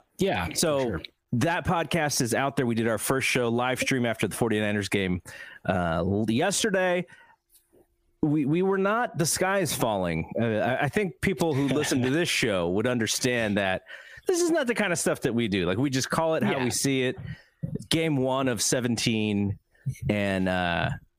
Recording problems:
squashed, flat; heavily

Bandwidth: 15 kHz